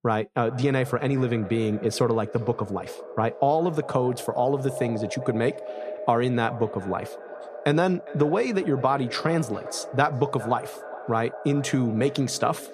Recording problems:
echo of what is said; noticeable; throughout; 410 ms later, 10 dB below the speech

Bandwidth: 14.5 kHz